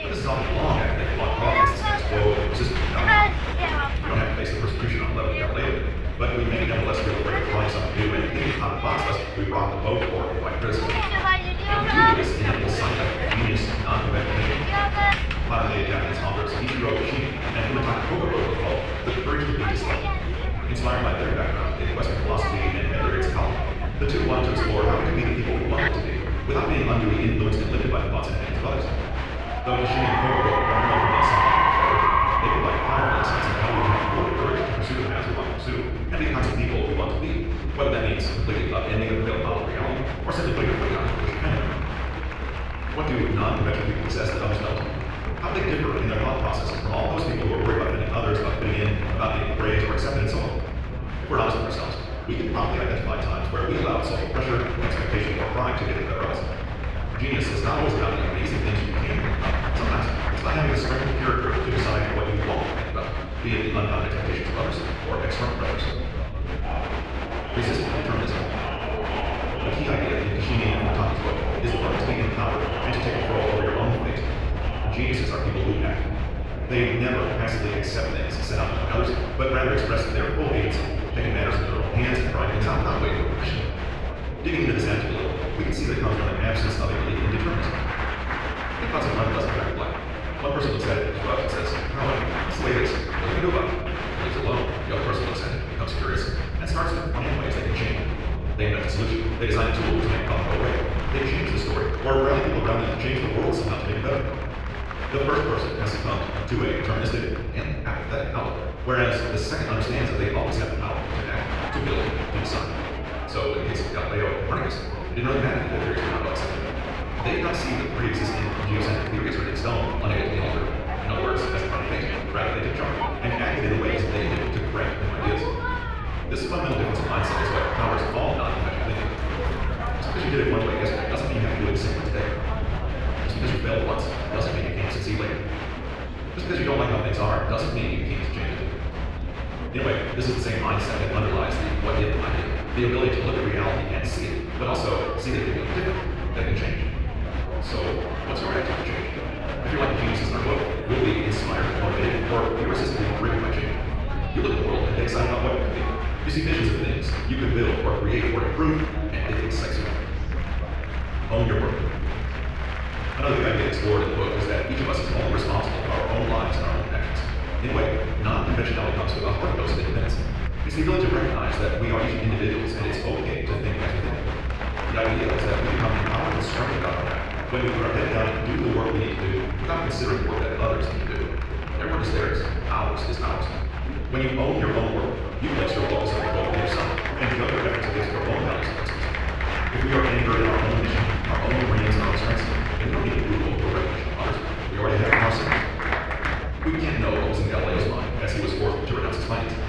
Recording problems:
off-mic speech; far
wrong speed, natural pitch; too fast; 1.6 times normal speed
room echo; noticeable; dies away in 1.1 s
muffled; slightly; fading above 2.5 kHz
chatter from many people; loud; throughout; 4 dB below the speech
low rumble; faint; throughout; 20 dB below the speech

